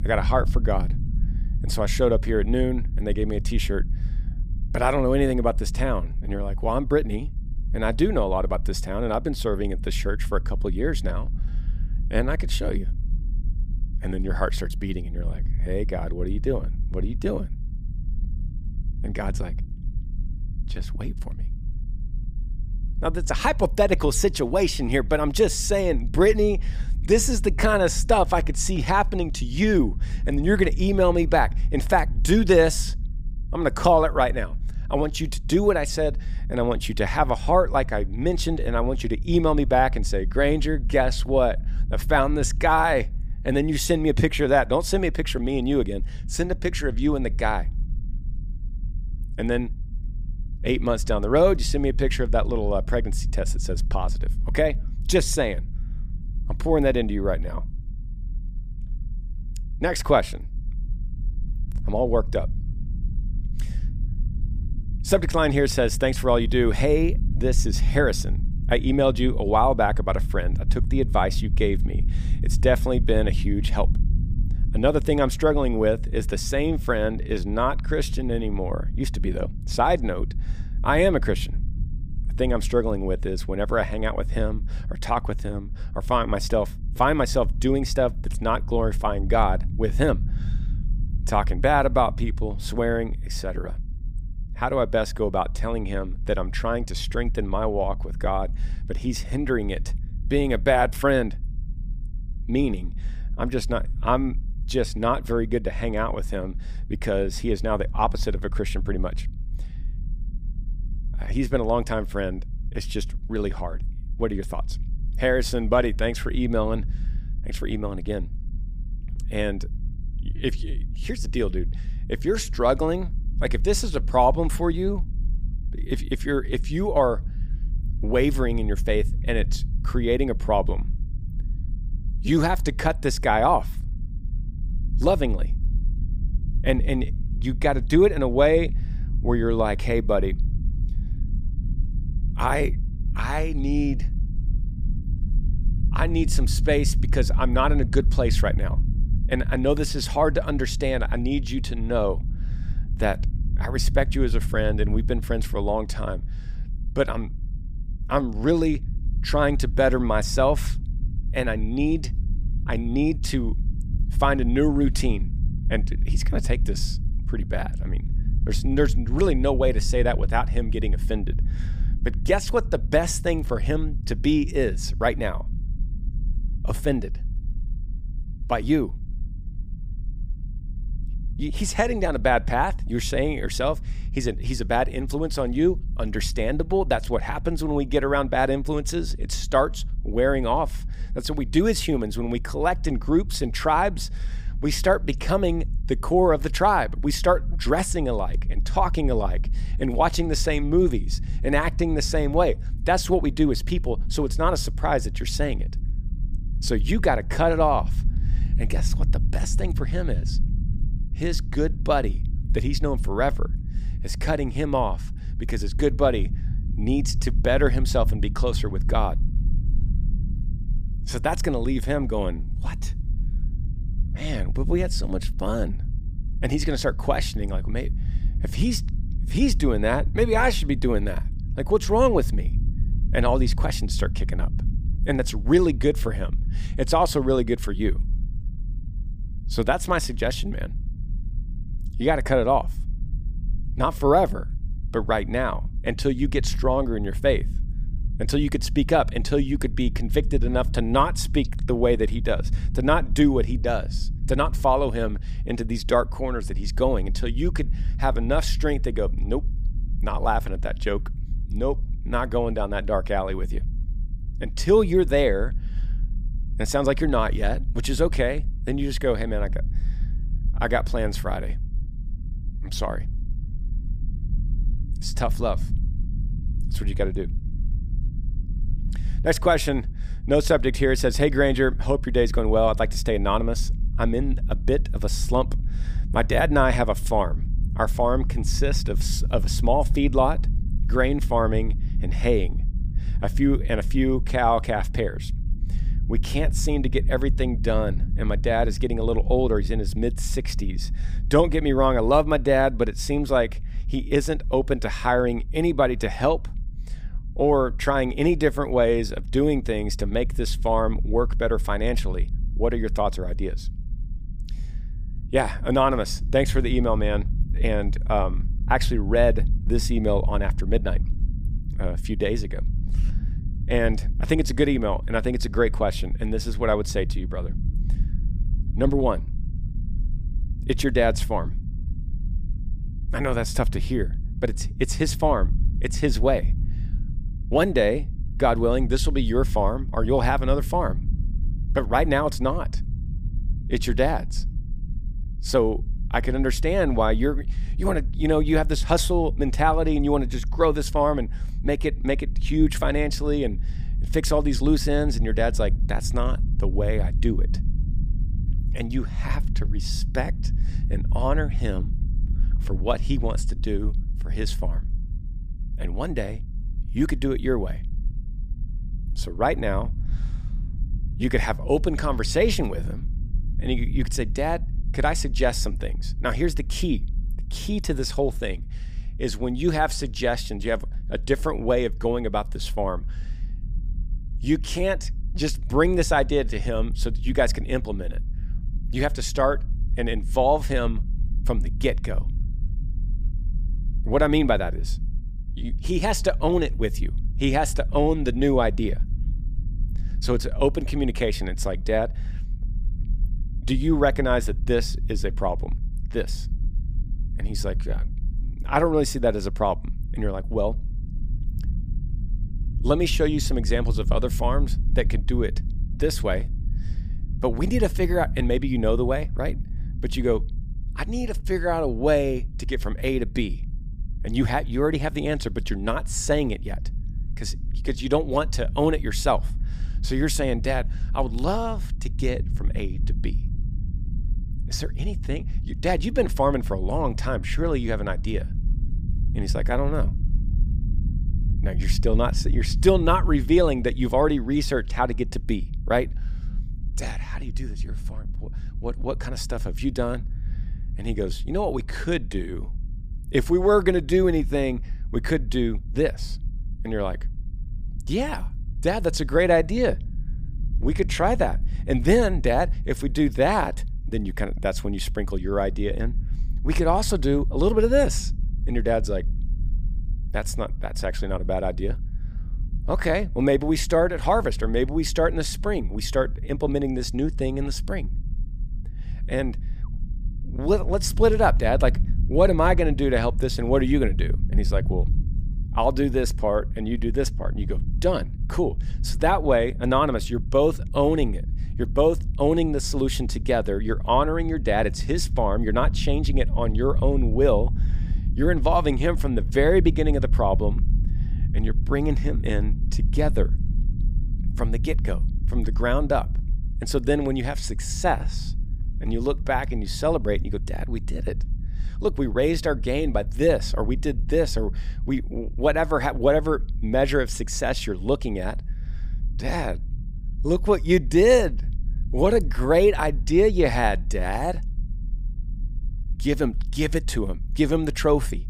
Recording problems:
low rumble; faint; throughout; 20 dB below the speech

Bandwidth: 15 kHz